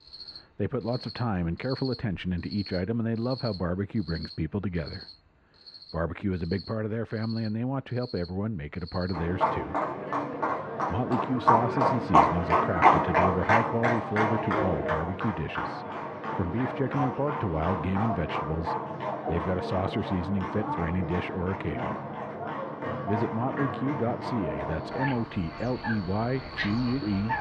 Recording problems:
muffled; very; fading above 1.5 kHz
animal sounds; very loud; throughout; 1 dB above the speech

